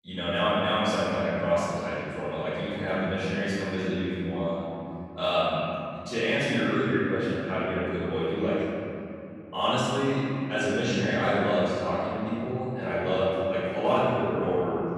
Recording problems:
room echo; strong; dies away in 3 s
off-mic speech; far

